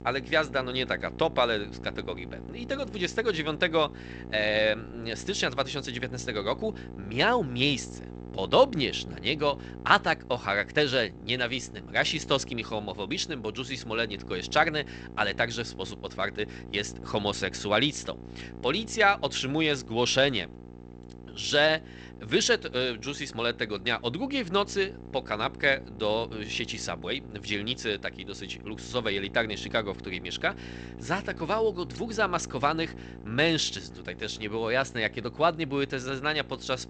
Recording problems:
garbled, watery; slightly; nothing above 8 kHz
electrical hum; faint; throughout; 60 Hz, 20 dB below the speech

